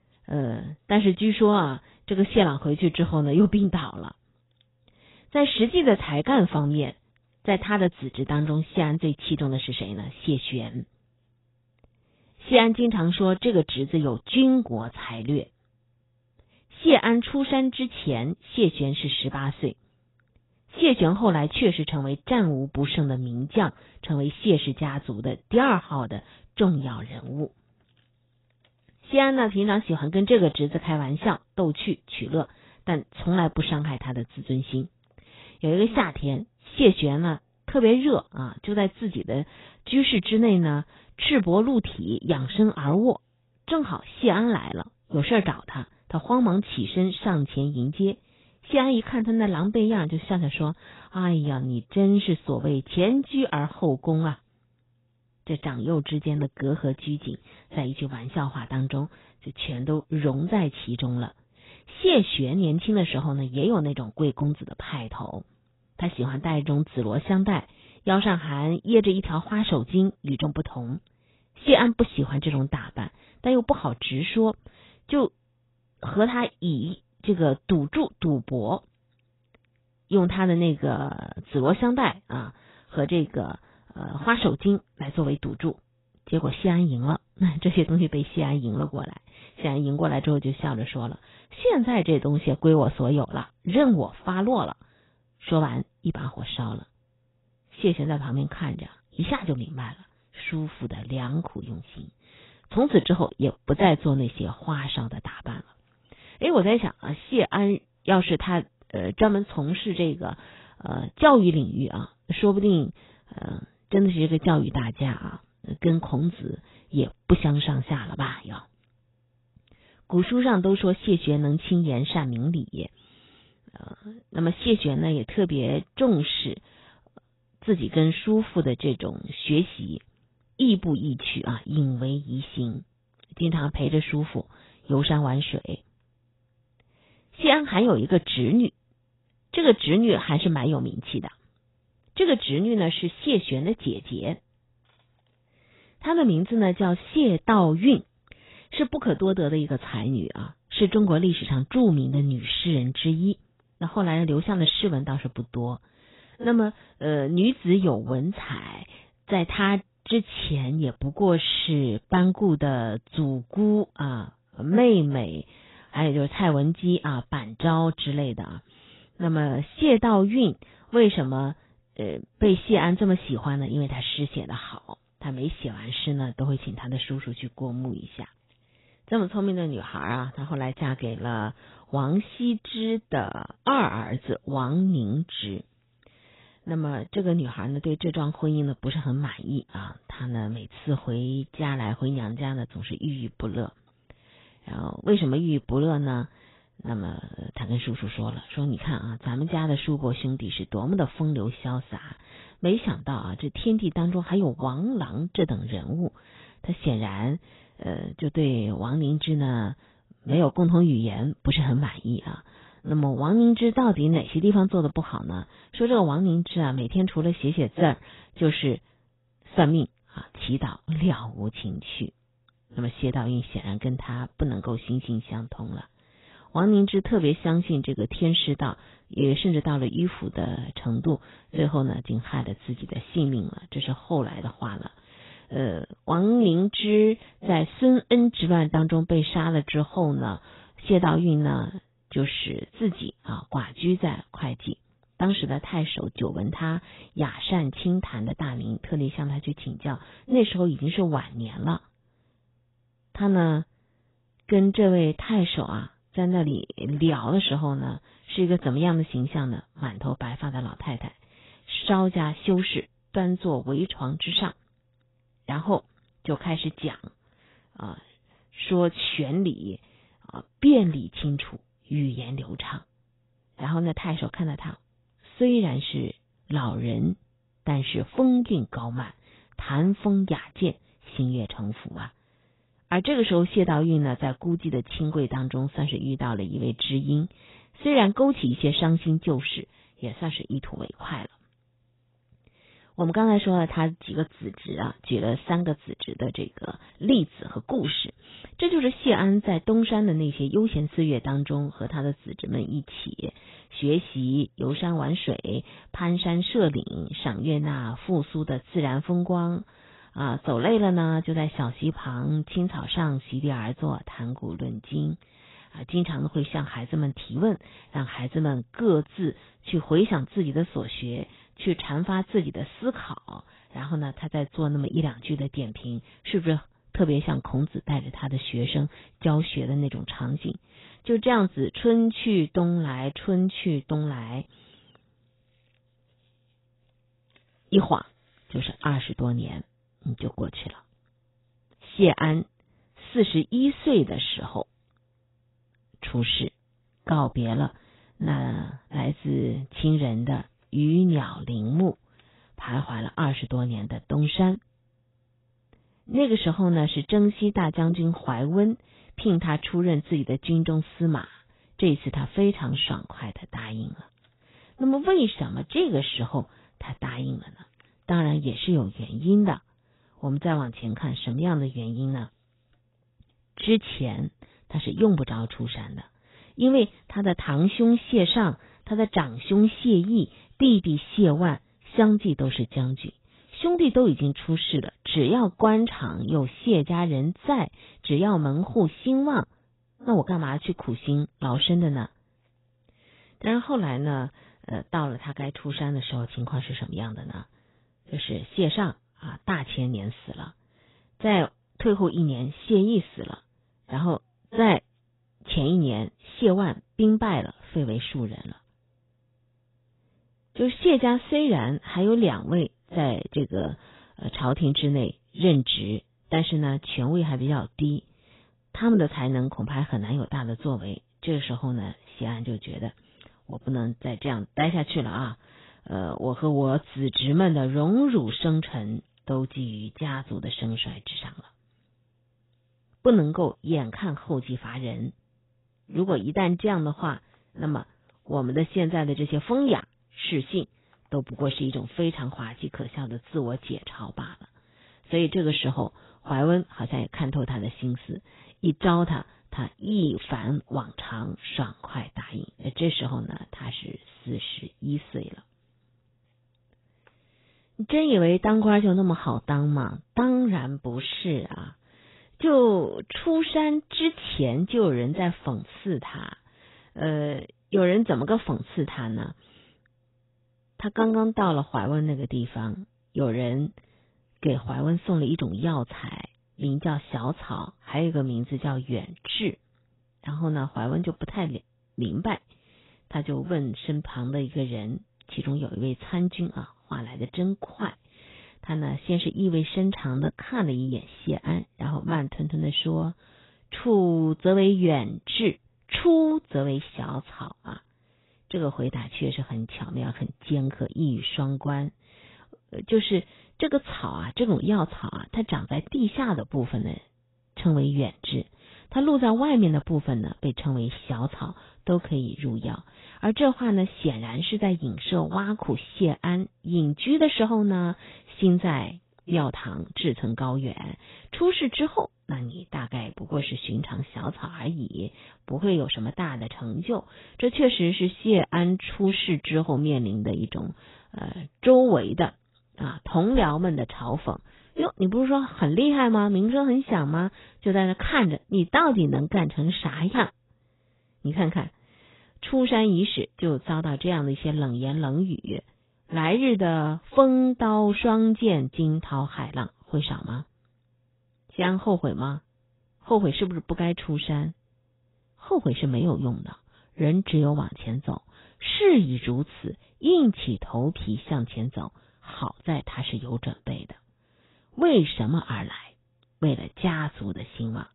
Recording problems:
garbled, watery; badly; nothing above 4 kHz

